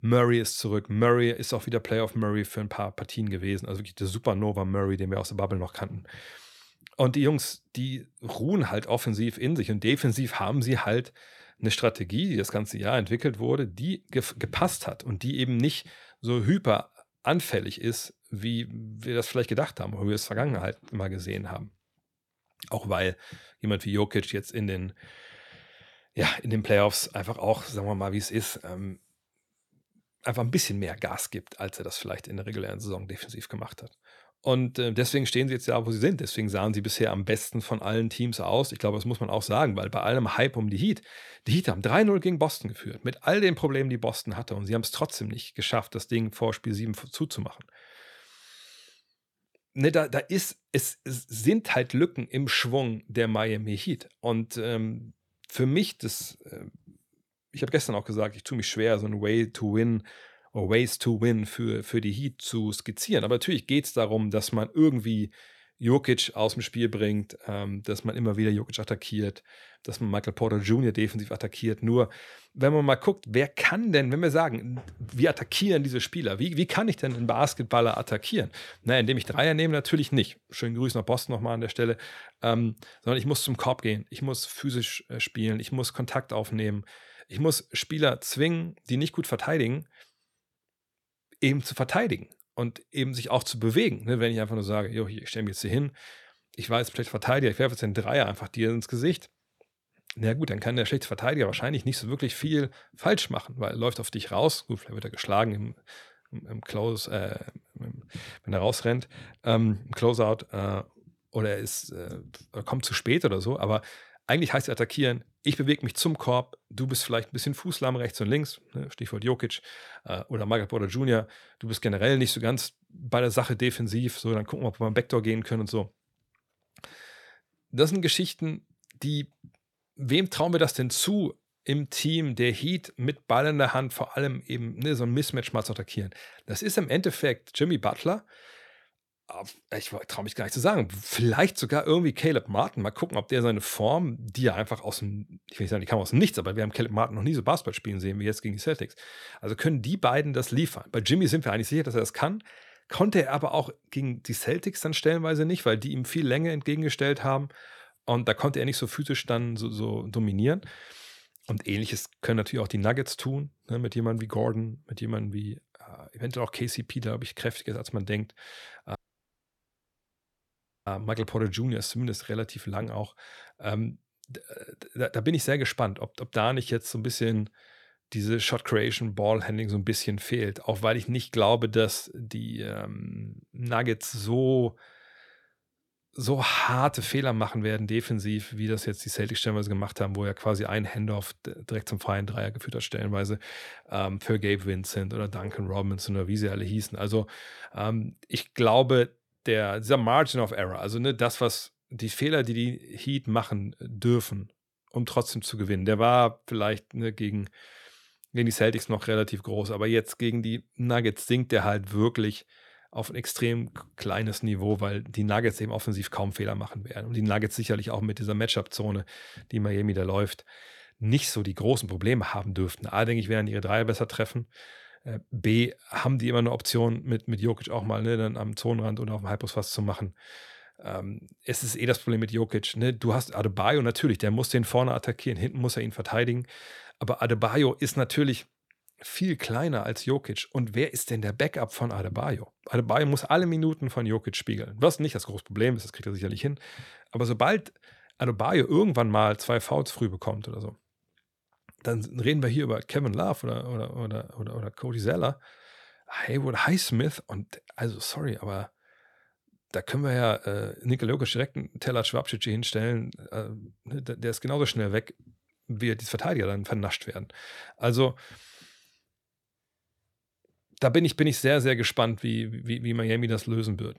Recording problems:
audio cutting out; at 2:49 for 2 s

